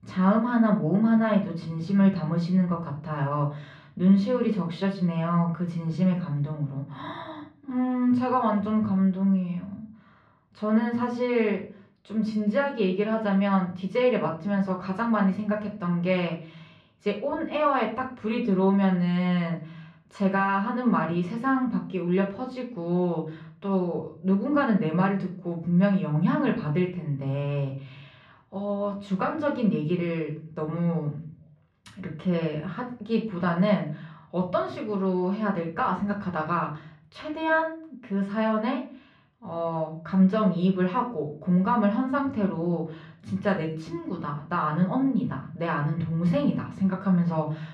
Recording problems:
muffled; slightly; fading above 3 kHz
room echo; slight; dies away in 0.4 s
off-mic speech; somewhat distant

